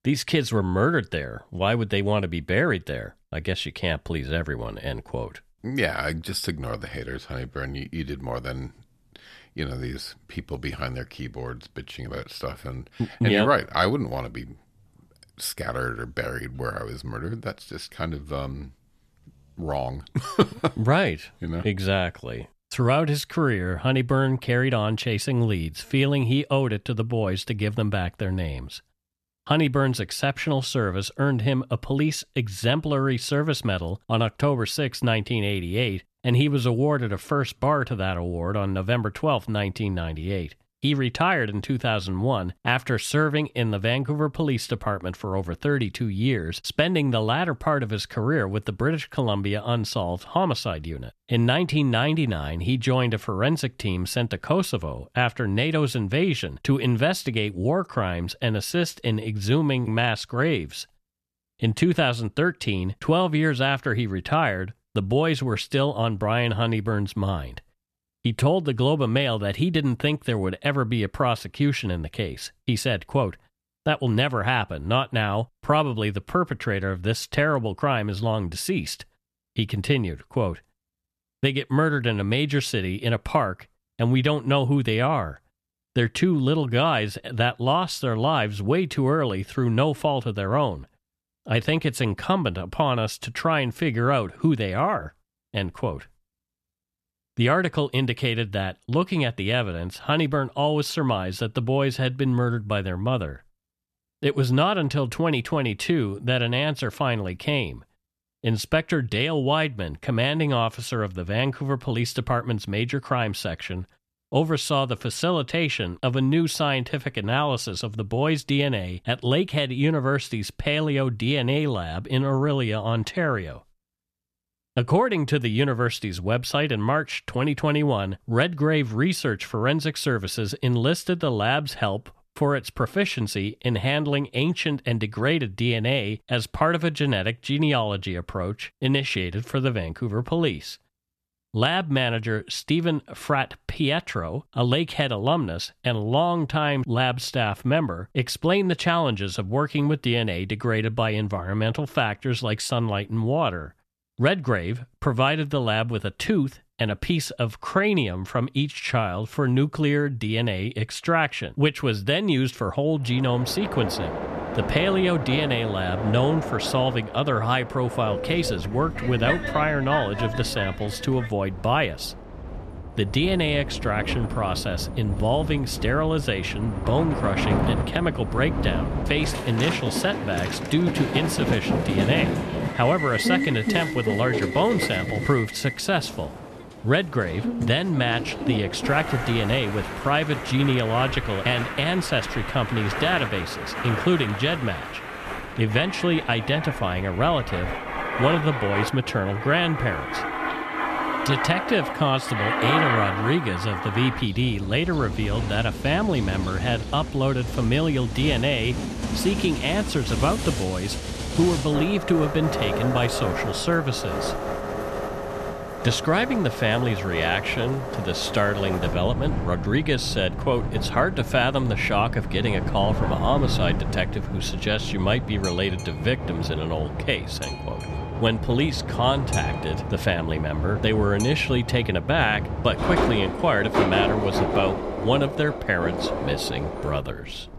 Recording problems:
train or aircraft noise; loud; from 2:44 on; 5 dB below the speech

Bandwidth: 13.5 kHz